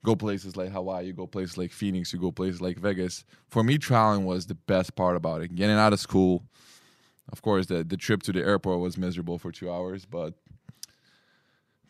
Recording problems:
none

